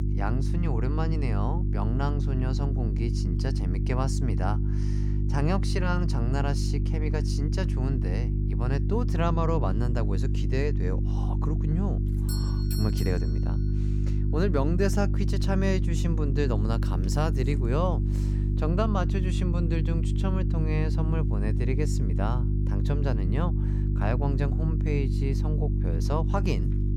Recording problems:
electrical hum; loud; throughout; 50 Hz, 6 dB below the speech
doorbell; noticeable; from 12 to 13 s; peak 7 dB below the speech

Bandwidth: 17 kHz